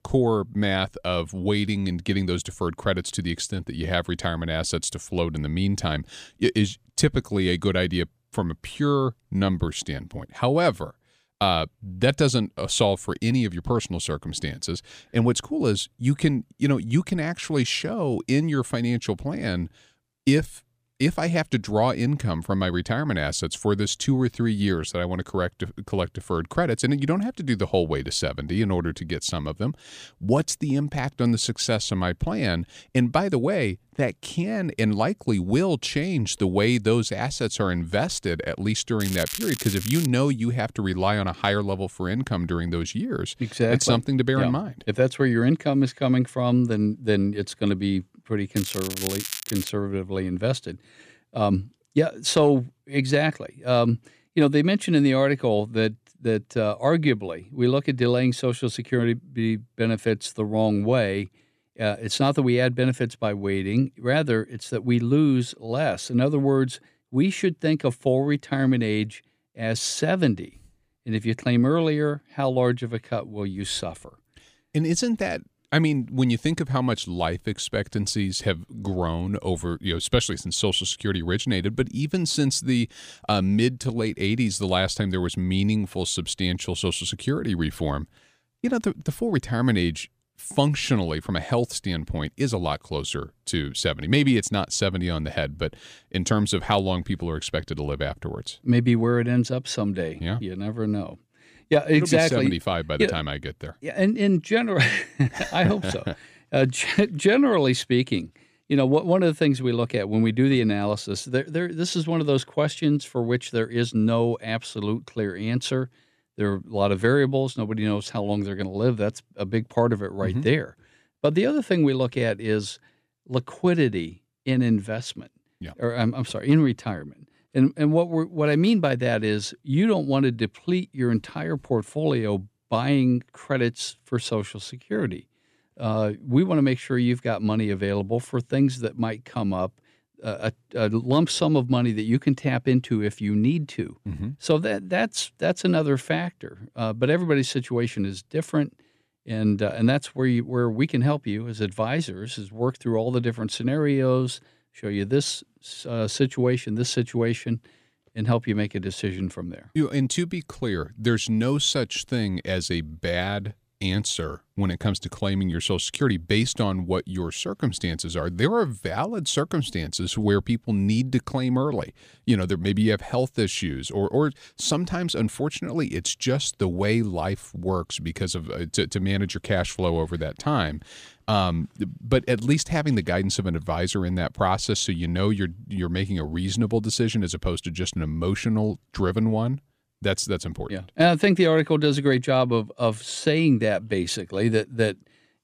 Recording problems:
crackling; loud; from 39 to 40 s and from 49 to 50 s; 7 dB below the speech

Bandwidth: 15 kHz